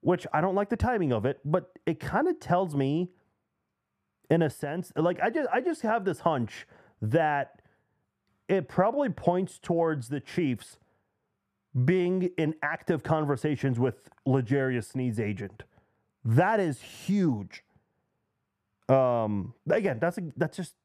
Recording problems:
muffled; slightly; fading above 2 kHz

